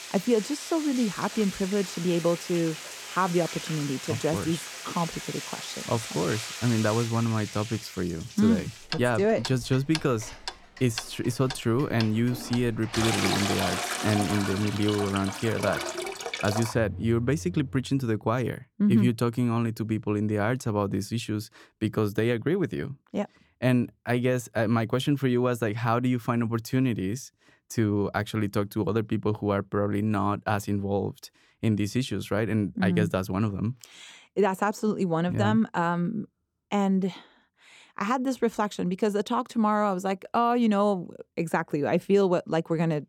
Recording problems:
household noises; loud; until 18 s; 7 dB below the speech

